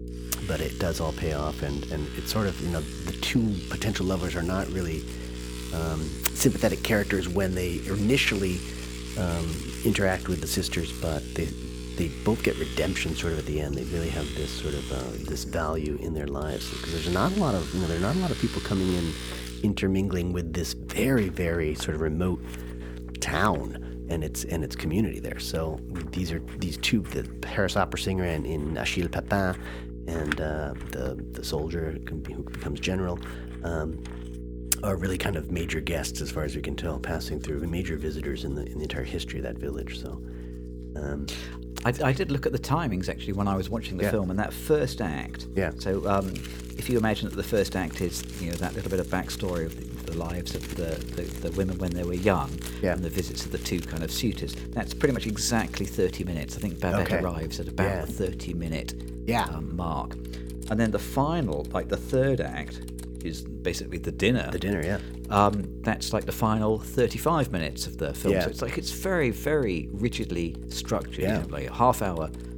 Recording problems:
electrical hum; noticeable; throughout; 60 Hz, 15 dB below the speech
household noises; noticeable; throughout; 15 dB below the speech

